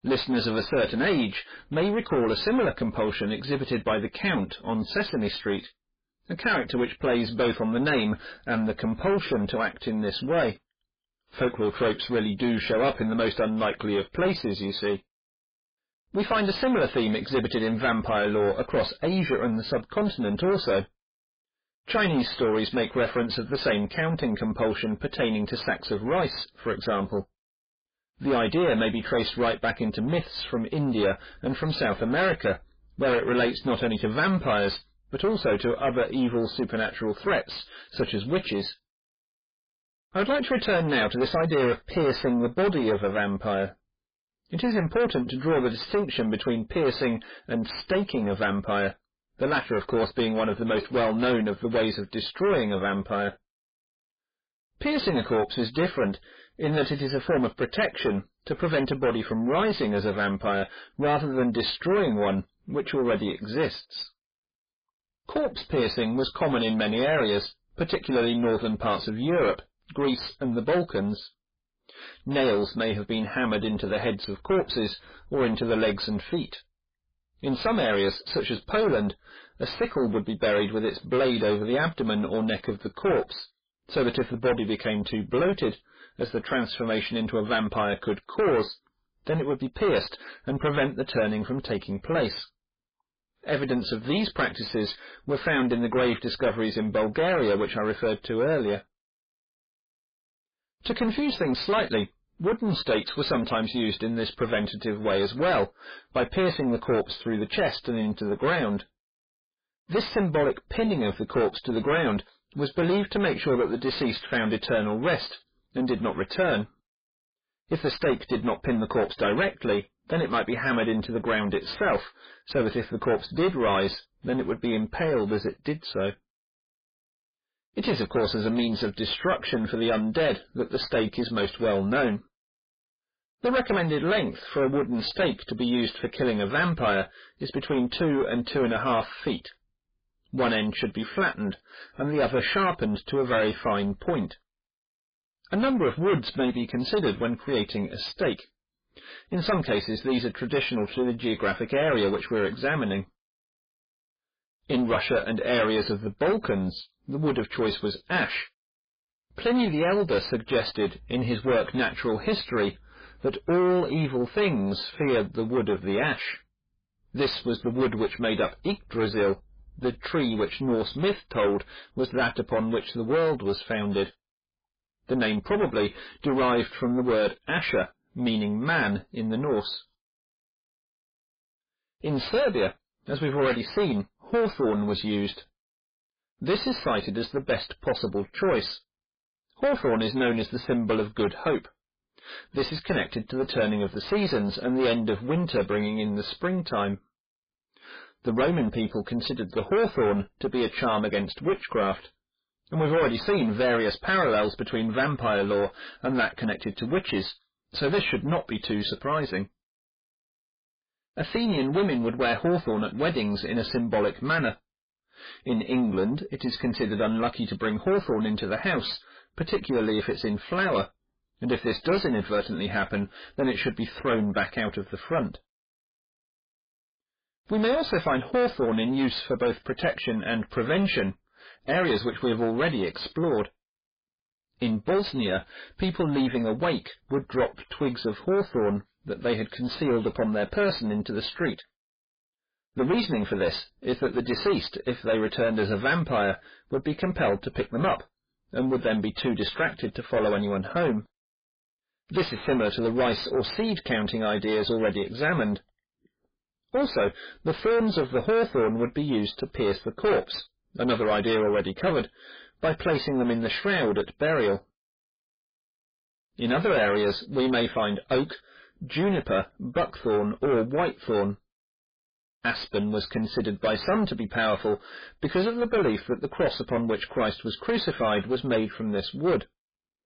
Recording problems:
distortion; heavy; 6 dB below the speech
garbled, watery; badly; nothing above 5 kHz

